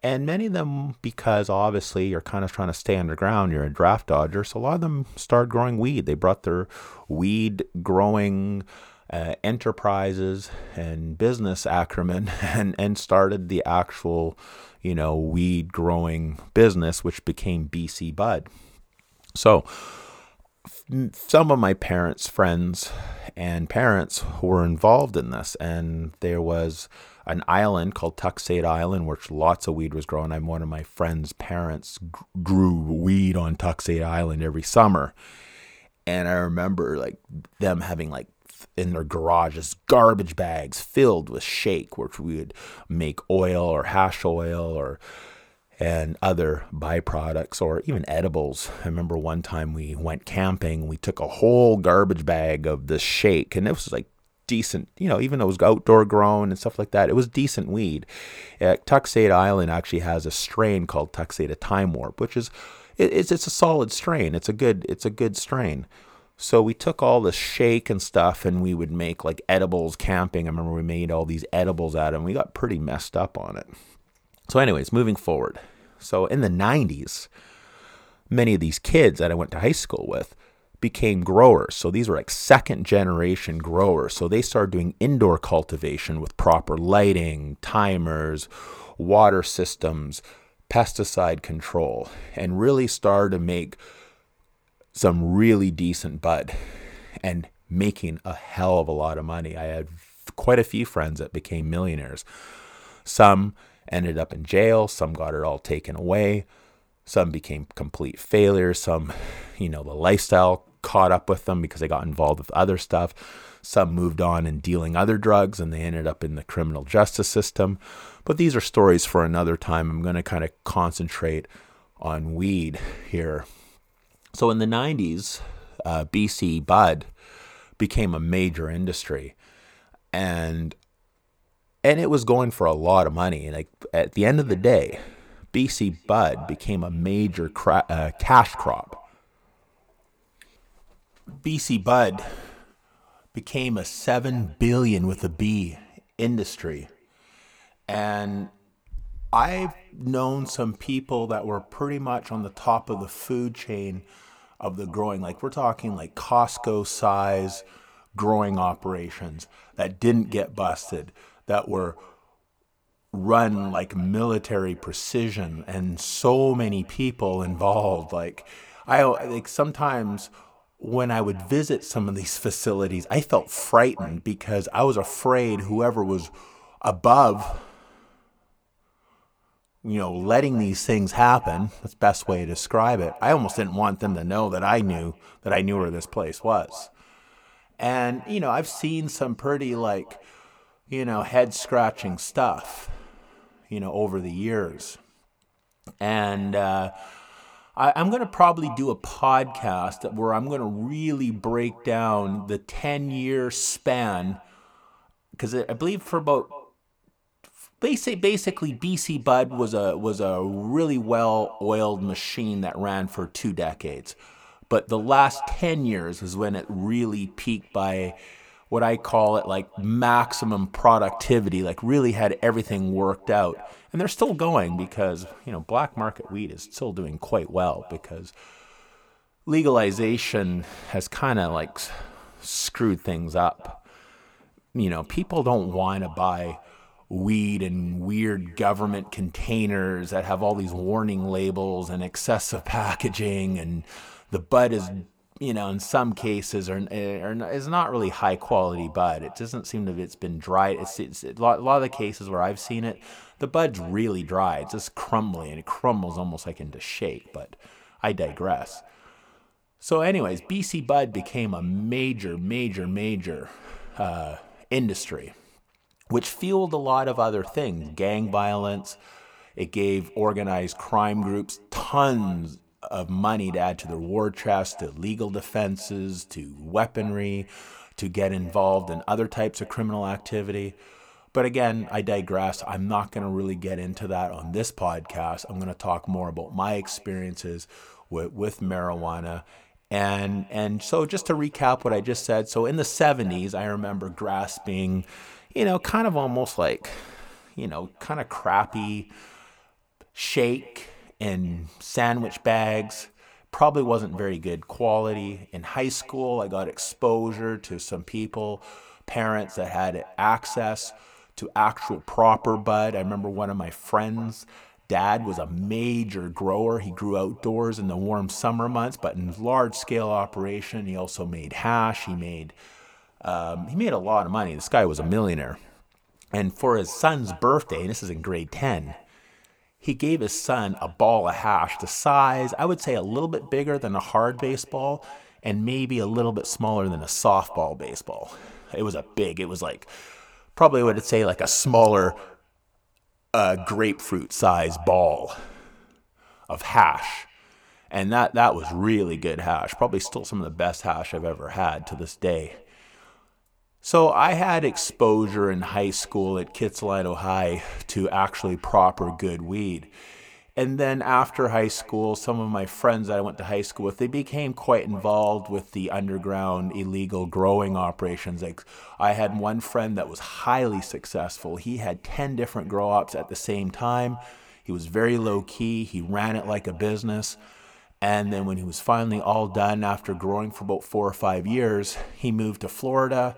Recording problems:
echo of what is said; faint; from 2:14 on; 230 ms later, 20 dB below the speech

